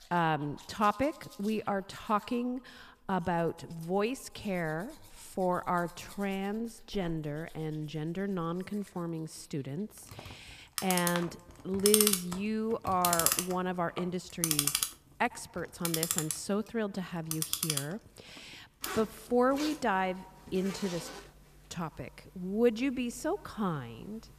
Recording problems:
echo of what is said; faint; throughout; 100 ms later, 25 dB below the speech
household noises; very loud; throughout; 1 dB above the speech

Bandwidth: 14.5 kHz